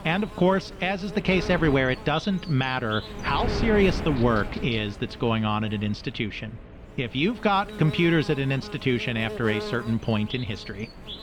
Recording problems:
muffled; very; fading above 3 kHz
electrical hum; noticeable; throughout; 60 Hz, 15 dB below the speech
wind noise on the microphone; occasional gusts; 15 dB below the speech

